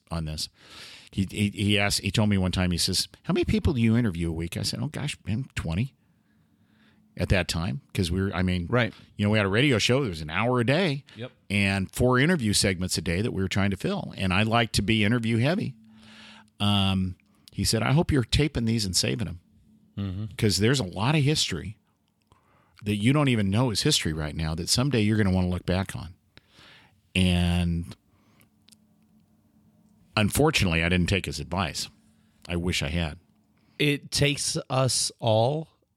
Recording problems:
none

